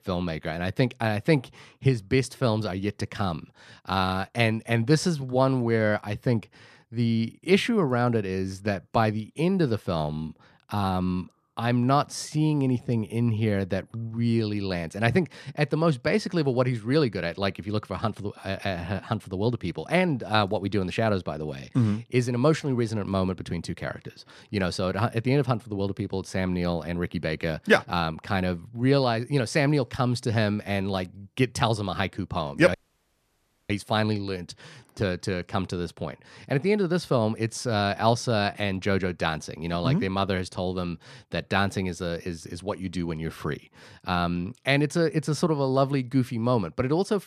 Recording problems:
audio cutting out; at 33 s for 1 s

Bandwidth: 14 kHz